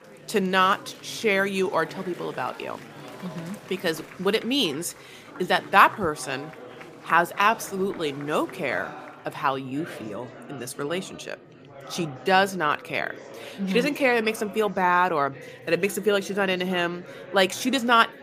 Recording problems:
murmuring crowd; noticeable; throughout; 20 dB below the speech

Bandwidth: 15 kHz